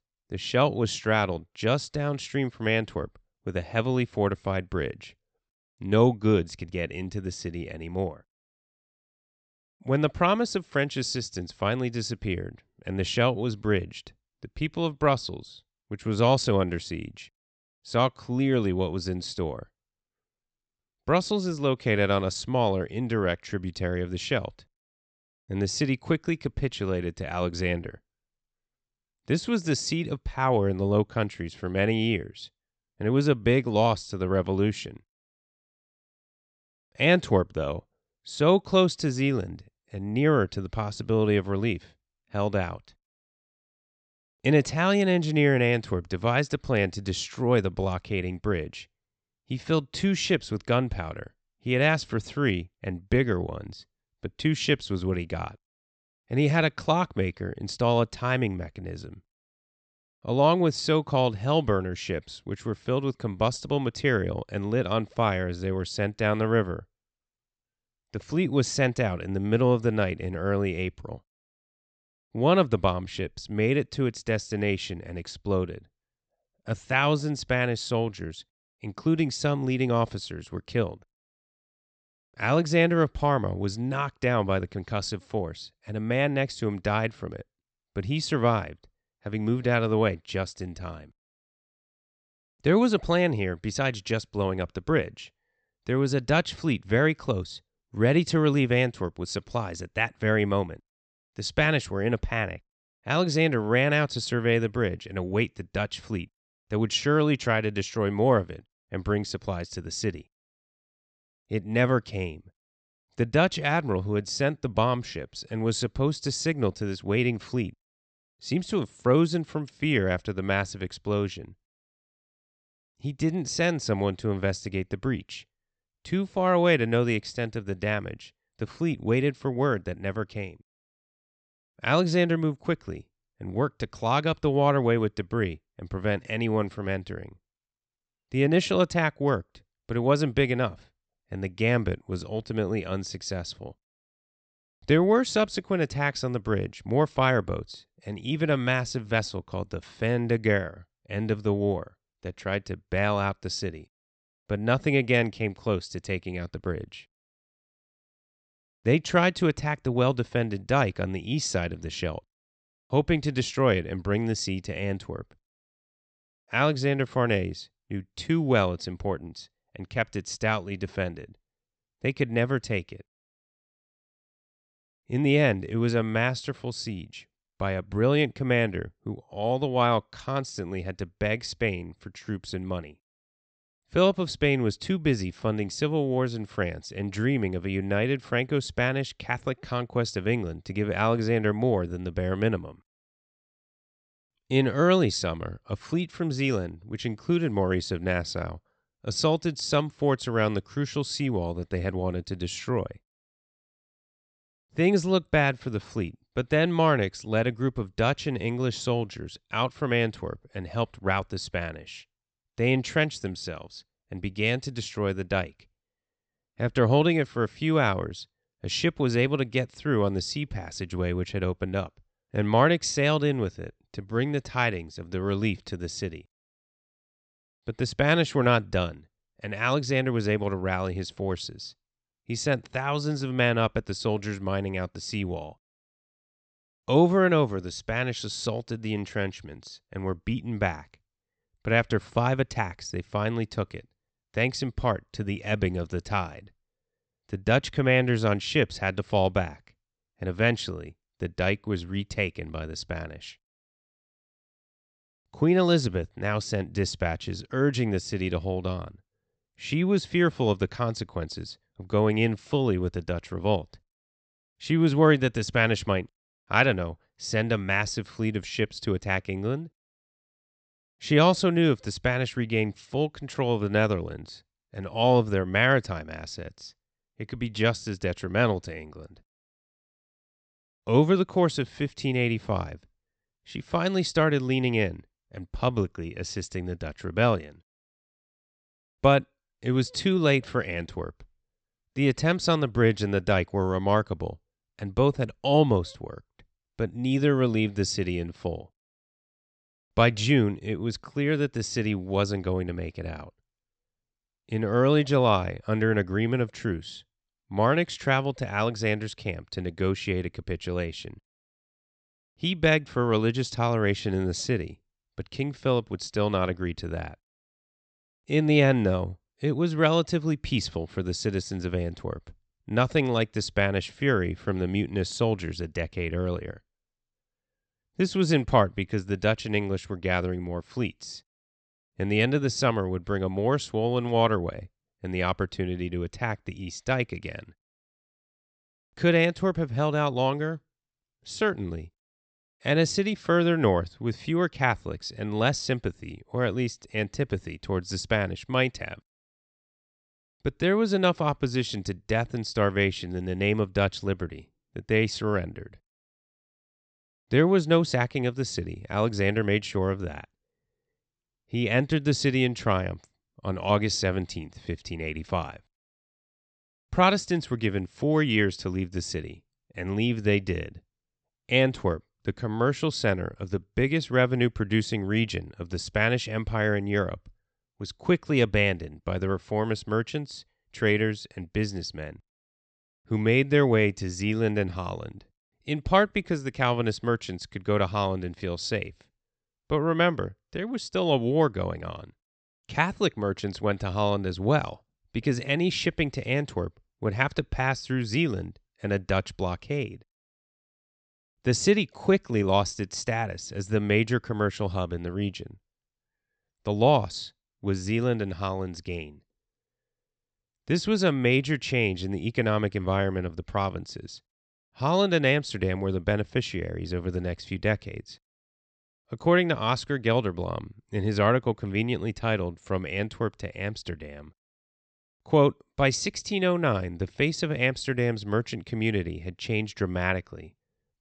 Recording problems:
high frequencies cut off; noticeable; nothing above 8 kHz

